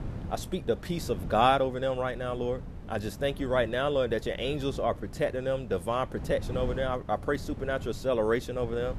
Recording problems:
wind noise on the microphone; occasional gusts; 20 dB below the speech

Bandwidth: 13.5 kHz